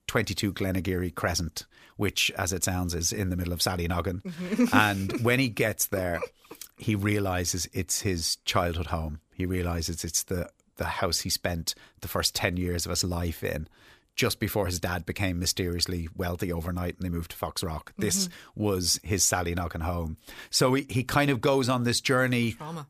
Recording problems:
none

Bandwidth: 14.5 kHz